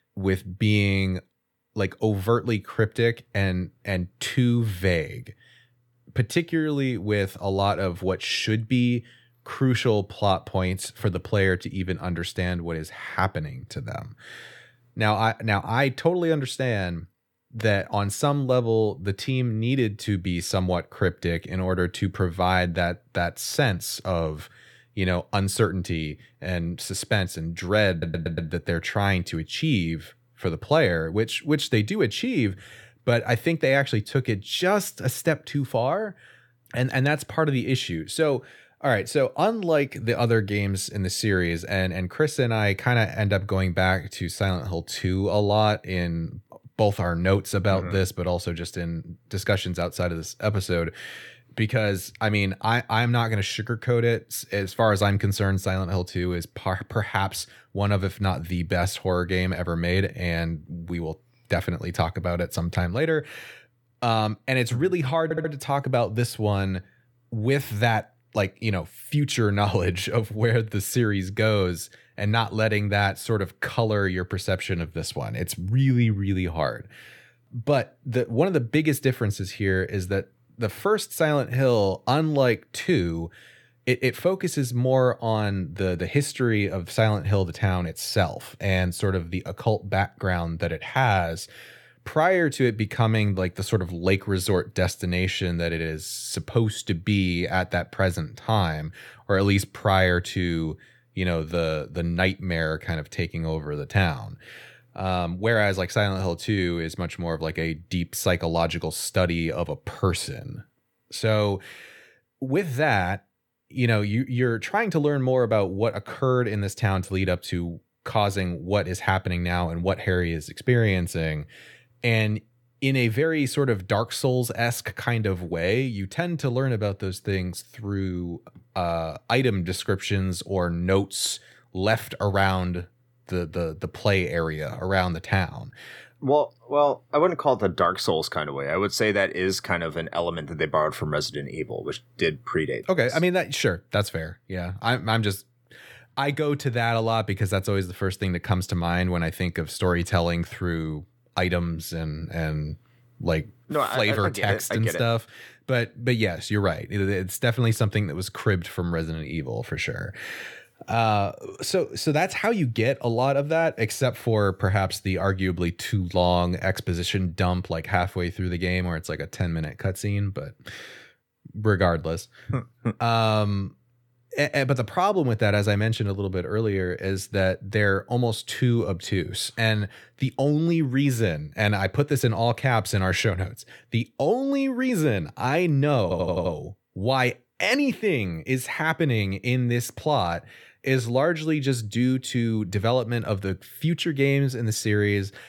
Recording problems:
audio stuttering; at 28 s, at 1:05 and at 3:06

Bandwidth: 18.5 kHz